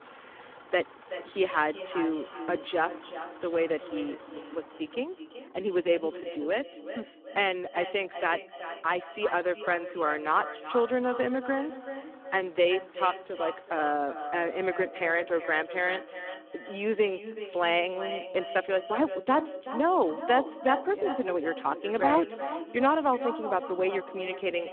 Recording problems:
phone-call audio; poor line
echo of what is said; strong; throughout; 380 ms later, 10 dB below the speech
traffic noise; faint; until 15 s; 25 dB below the speech

